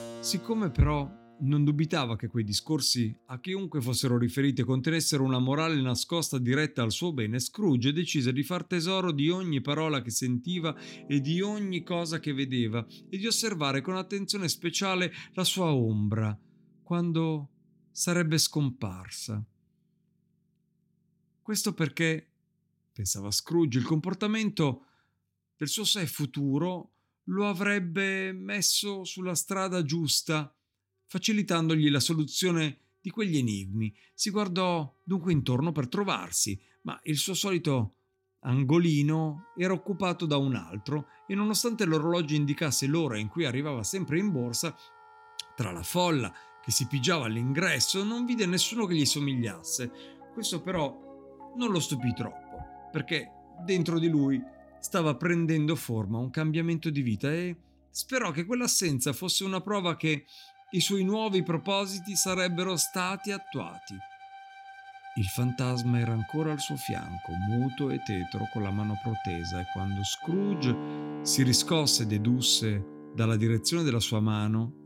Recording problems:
background music; noticeable; throughout; 15 dB below the speech

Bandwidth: 16.5 kHz